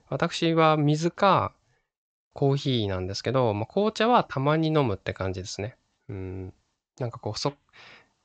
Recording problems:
high frequencies cut off; noticeable; nothing above 8 kHz

